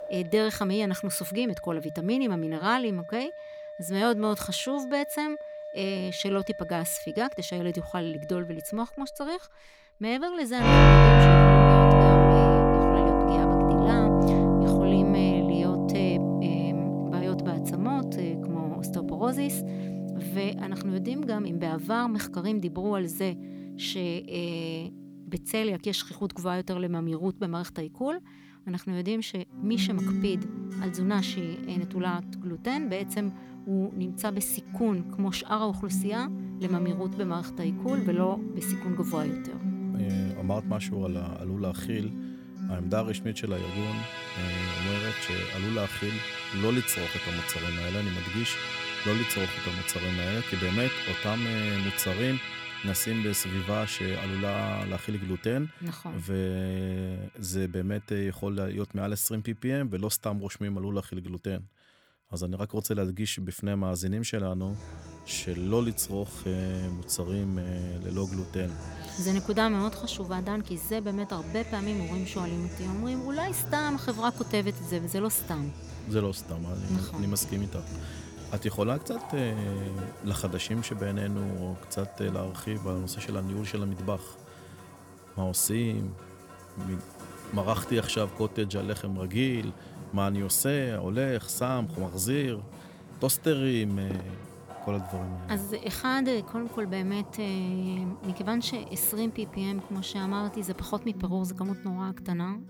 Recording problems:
background music; very loud; throughout; 5 dB above the speech

